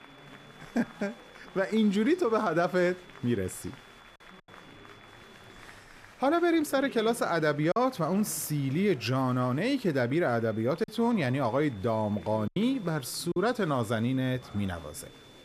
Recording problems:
high-pitched whine; faint; until 5.5 s and from 10 s on; 3.5 kHz, 30 dB below the speech
chatter from many people; faint; throughout; 20 dB below the speech
choppy; occasionally; at 7.5 s and from 11 to 13 s; 3% of the speech affected

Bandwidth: 14.5 kHz